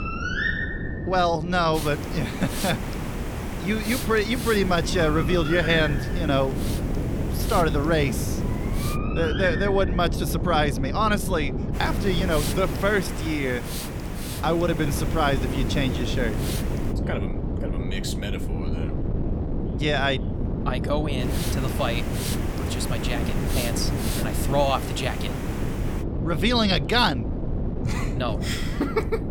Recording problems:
animal sounds; loud; throughout; 7 dB below the speech
hiss; loud; from 2 to 9 s, from 12 to 17 s and from 21 to 26 s; 9 dB below the speech
wind noise on the microphone; occasional gusts; 10 dB below the speech
voice in the background; faint; throughout; 25 dB below the speech

